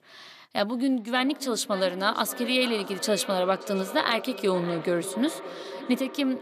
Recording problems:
echo of what is said; strong; throughout; 580 ms later, 10 dB below the speech

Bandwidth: 14.5 kHz